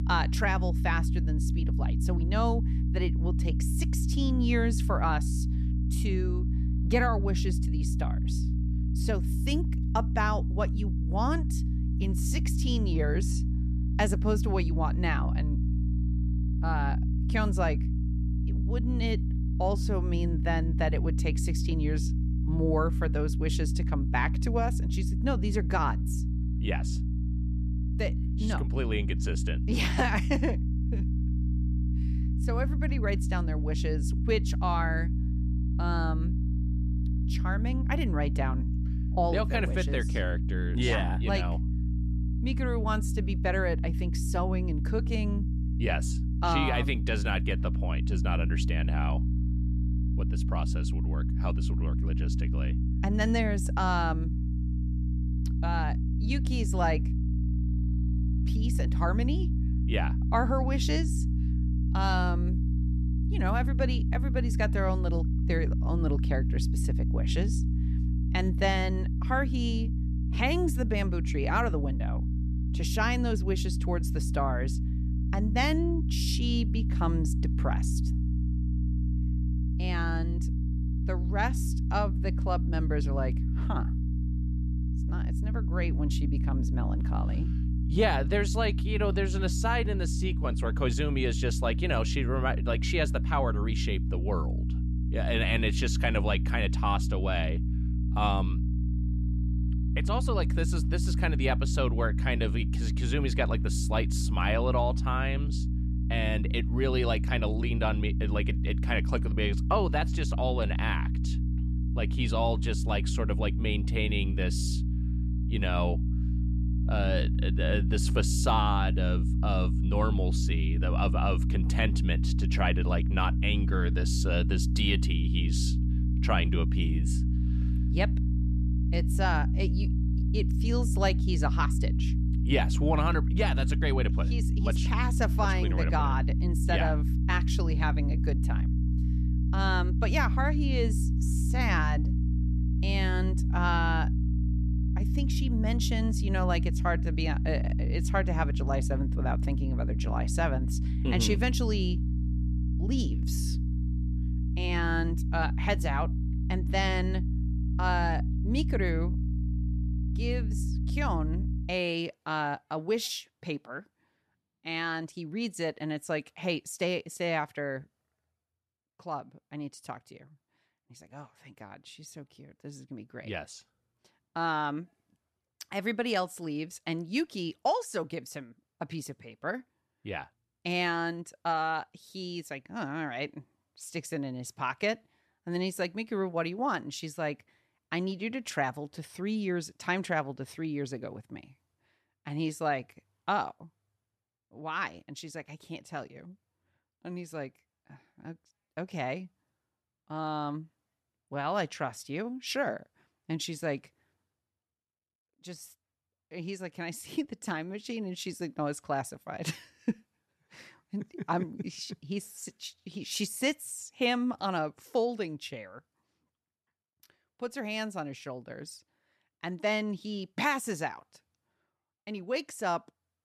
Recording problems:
electrical hum; loud; until 2:42; 60 Hz, 10 dB below the speech

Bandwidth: 13.5 kHz